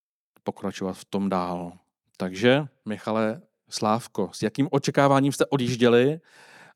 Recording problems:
none

